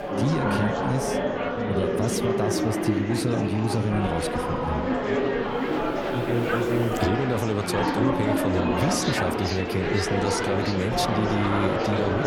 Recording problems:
murmuring crowd; very loud; throughout; 2 dB above the speech

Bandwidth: 18.5 kHz